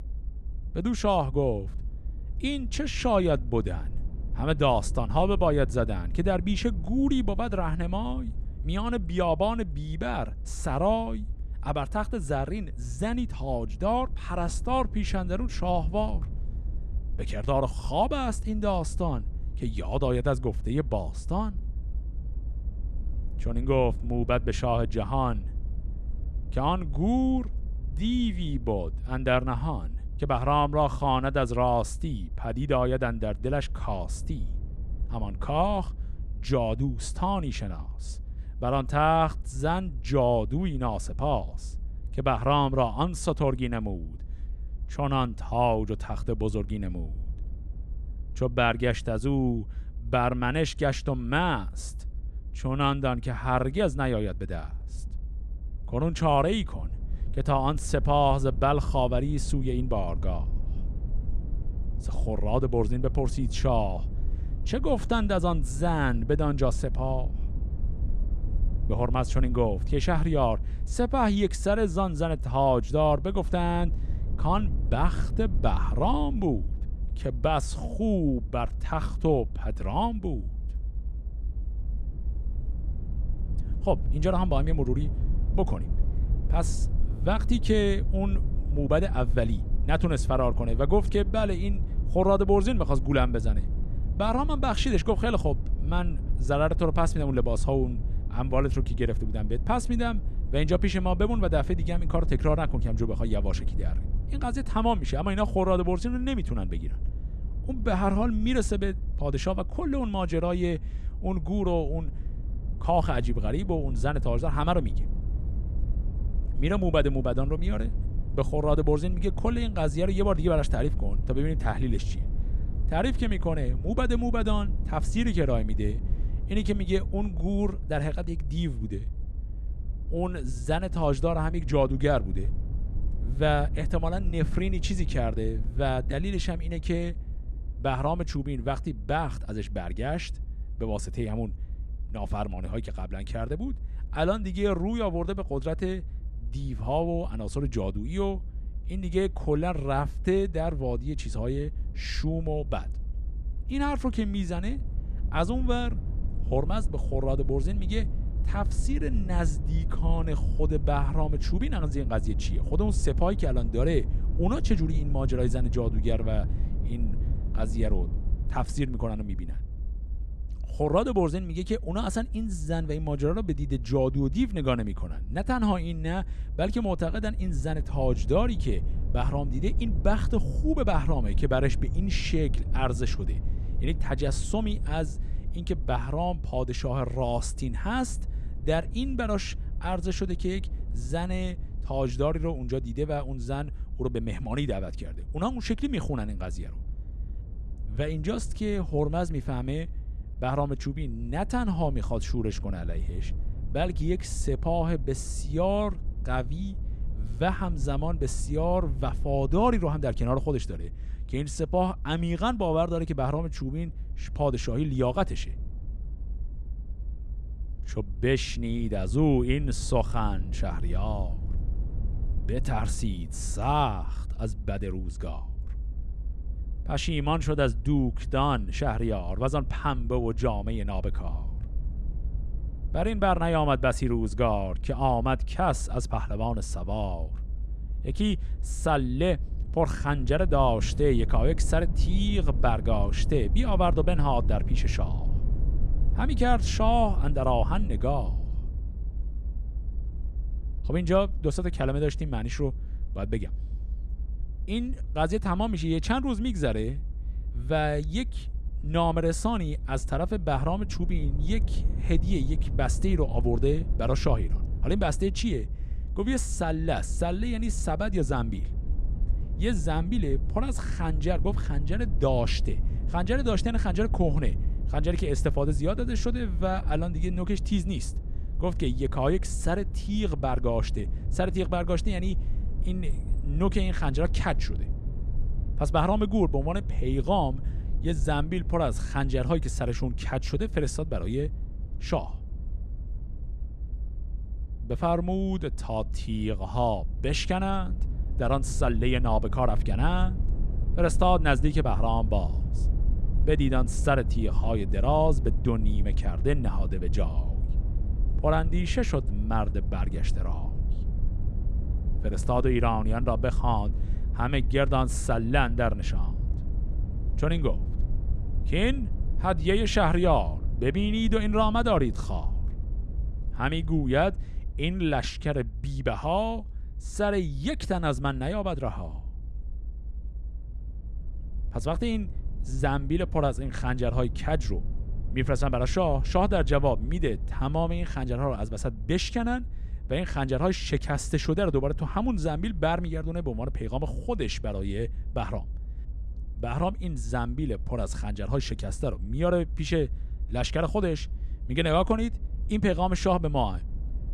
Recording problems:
low rumble; faint; throughout; 20 dB below the speech

